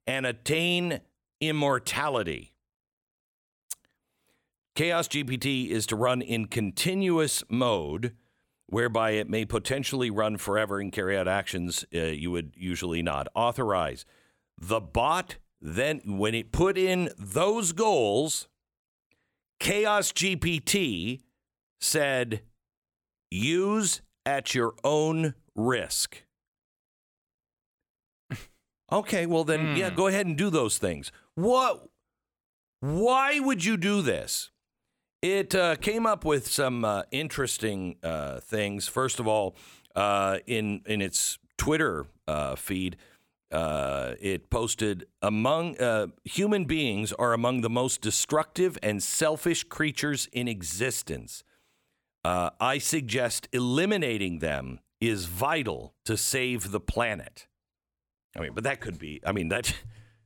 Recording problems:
none

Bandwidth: 17.5 kHz